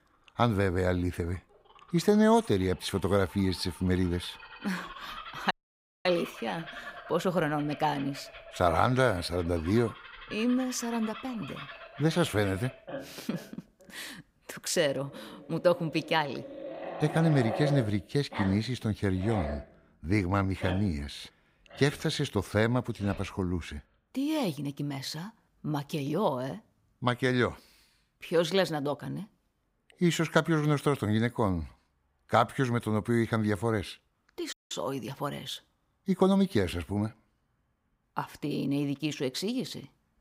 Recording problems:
animal sounds; noticeable; throughout; 15 dB below the speech
audio cutting out; at 5.5 s for 0.5 s and at 35 s

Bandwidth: 15.5 kHz